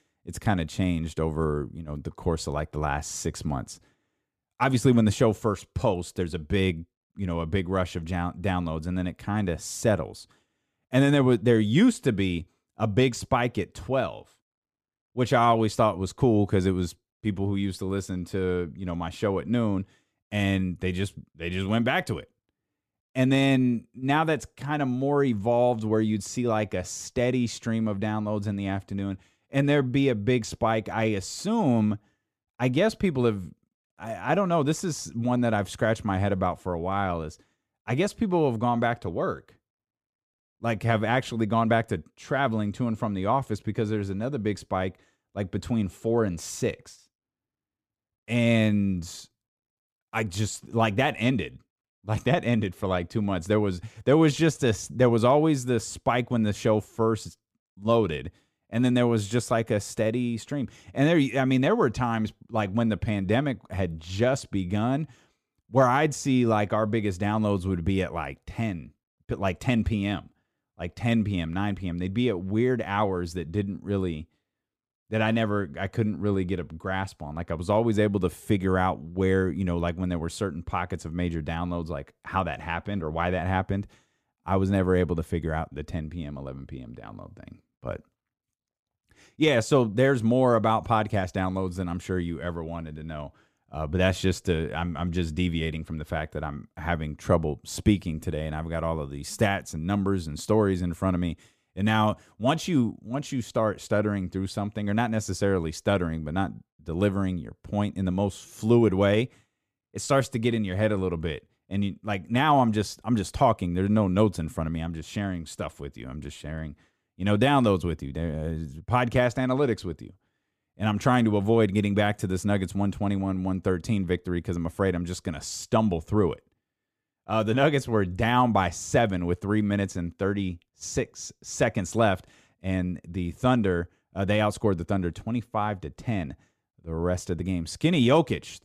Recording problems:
none

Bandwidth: 15 kHz